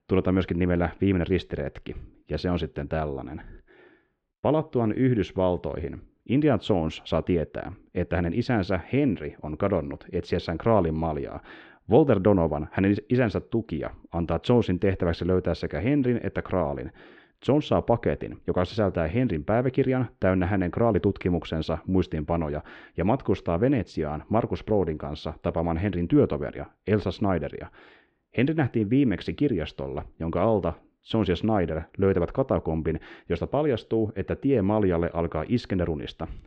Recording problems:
muffled; slightly; fading above 3.5 kHz

